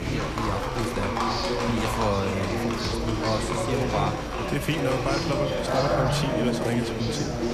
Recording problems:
murmuring crowd; very loud; throughout; 2 dB above the speech
animal sounds; loud; throughout; 3 dB below the speech
electrical hum; noticeable; throughout; 60 Hz, 10 dB below the speech
high-pitched whine; faint; throughout; 5.5 kHz, 20 dB below the speech
abrupt cut into speech; at the start

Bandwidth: 14.5 kHz